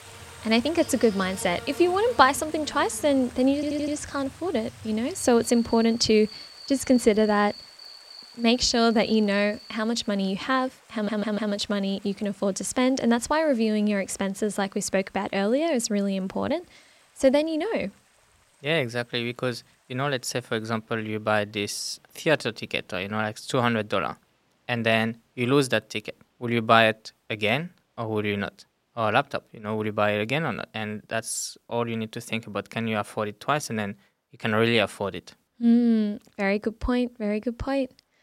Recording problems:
animal sounds; noticeable; until 9.5 s; 15 dB below the speech
rain or running water; faint; throughout; 25 dB below the speech
audio stuttering; at 3.5 s and at 11 s

